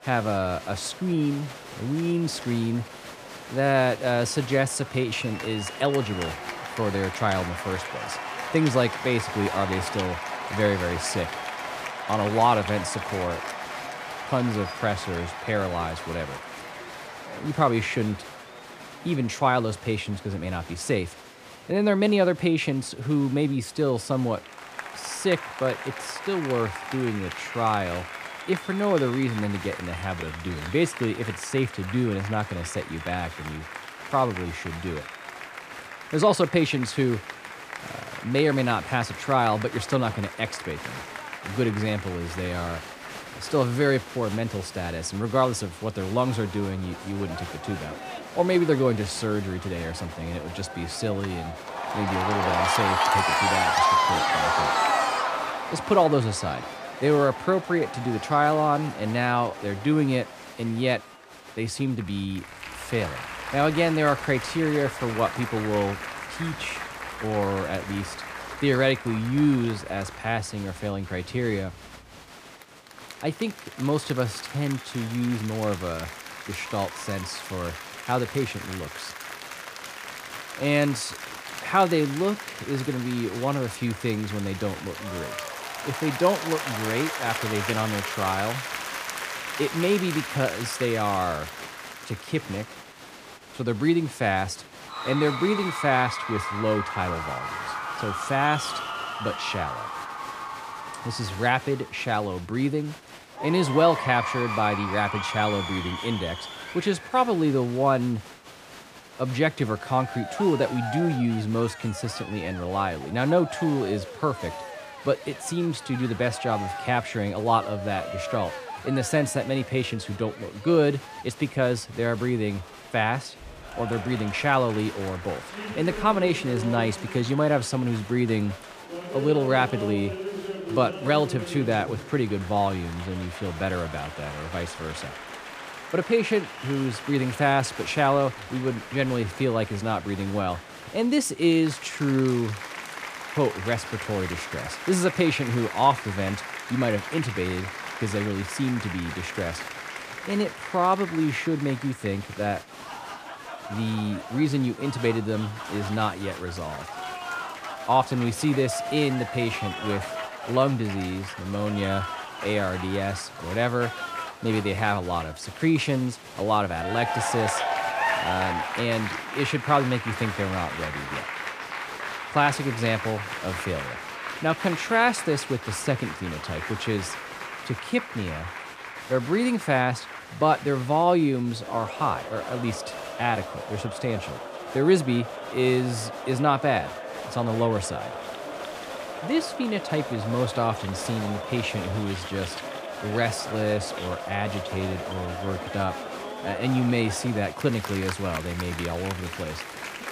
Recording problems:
crowd noise; loud; throughout; 7 dB below the speech

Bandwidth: 15 kHz